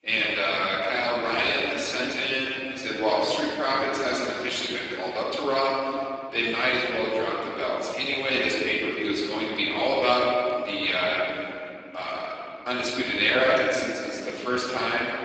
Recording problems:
room echo; strong; dies away in 2.7 s
off-mic speech; far
garbled, watery; badly; nothing above 7.5 kHz
thin; very slightly; fading below 300 Hz

